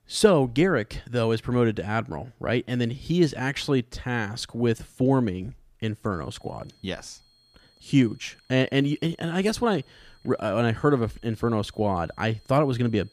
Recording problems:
high-pitched whine; faint; from 6 s on; 4.5 kHz, 35 dB below the speech

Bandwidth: 15 kHz